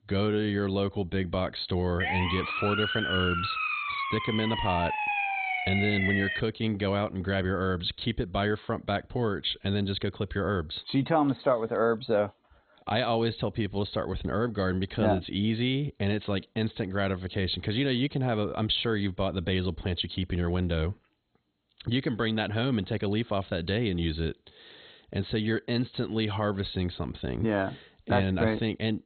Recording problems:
garbled, watery; badly; nothing above 4 kHz
siren; loud; from 2 to 6.5 s; peak 2 dB above the speech

